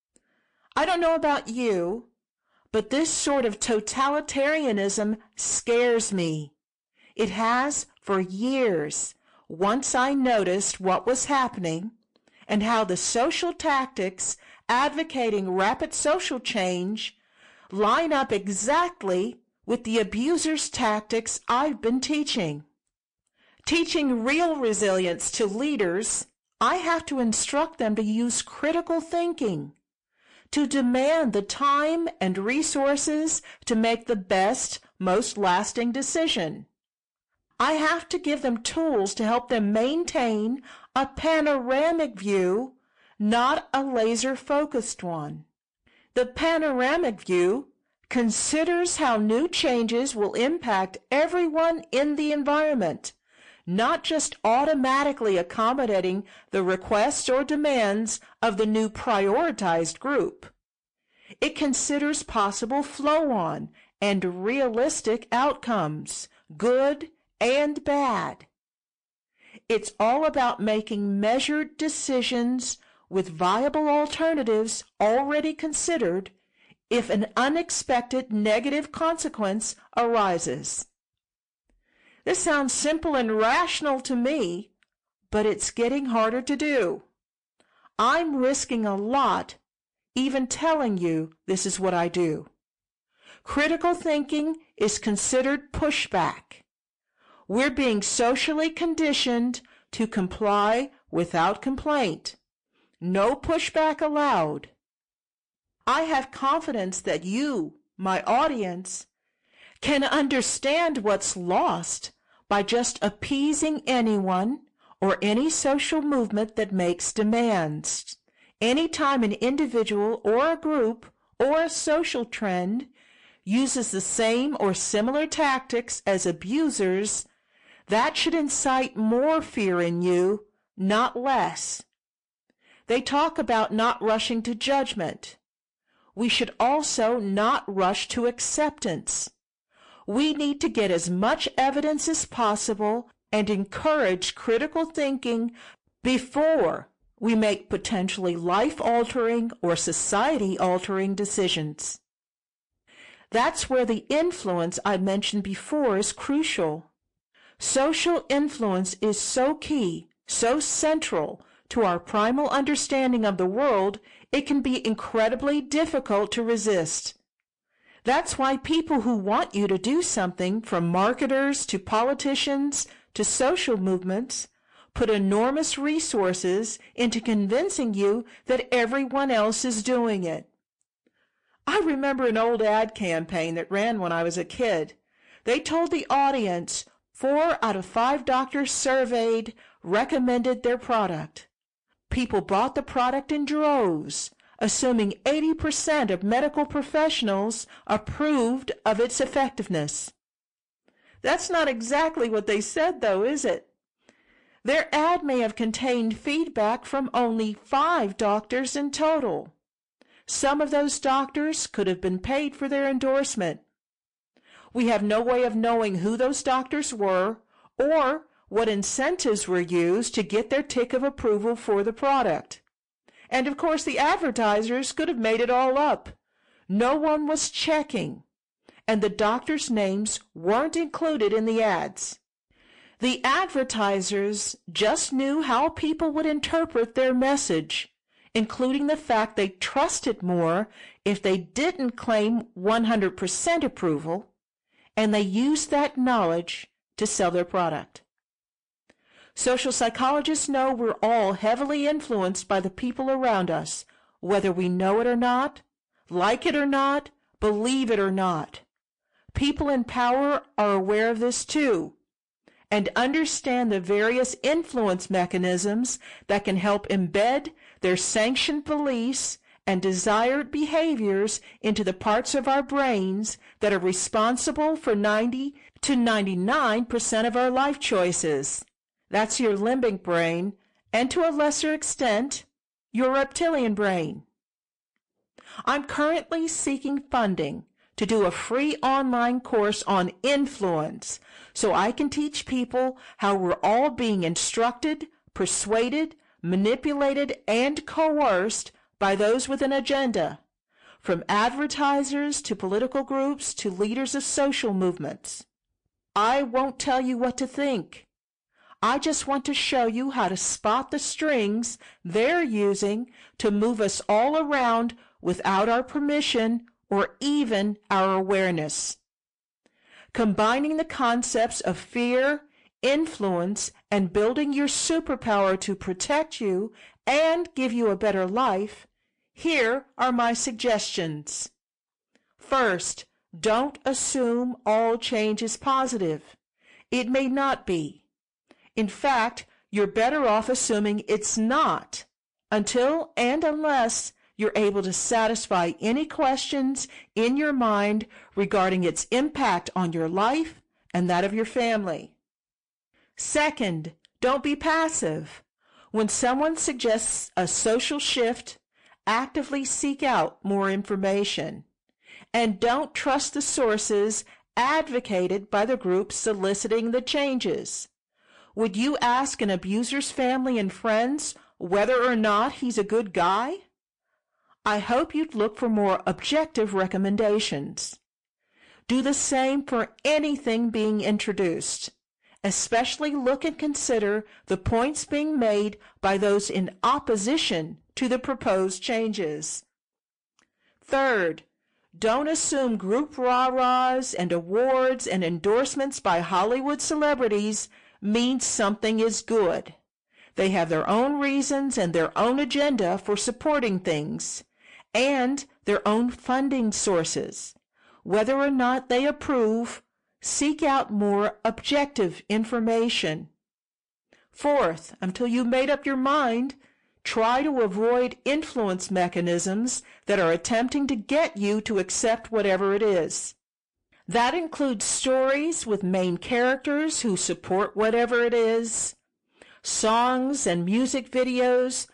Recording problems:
distortion; slight; 10 dB below the speech
garbled, watery; slightly; nothing above 8.5 kHz

